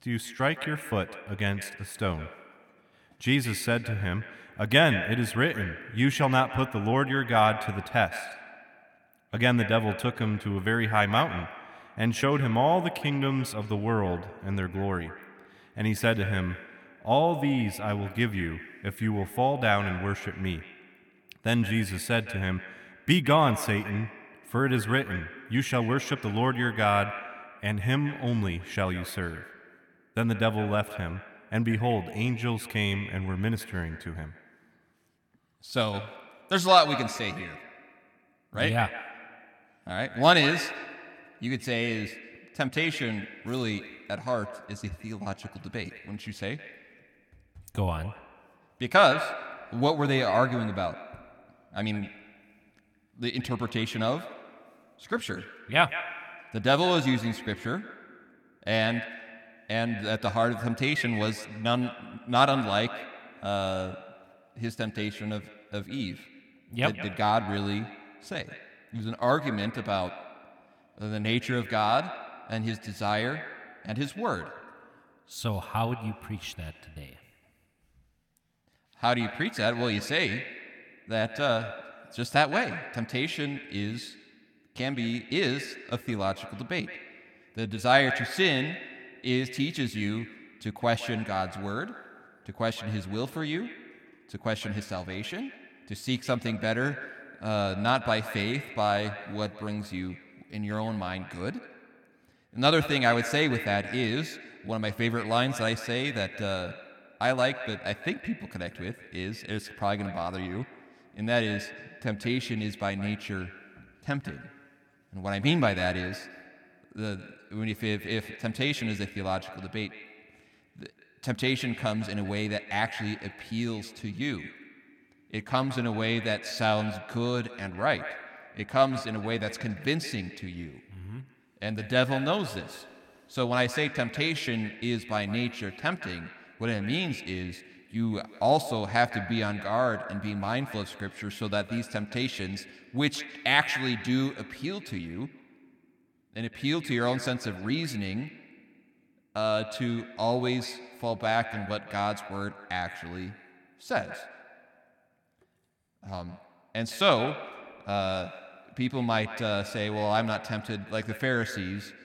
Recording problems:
echo of what is said; noticeable; throughout; 160 ms later, 10 dB below the speech

